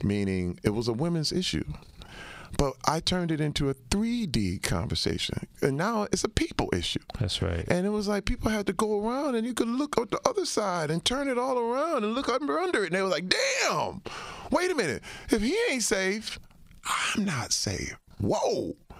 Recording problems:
squashed, flat; heavily

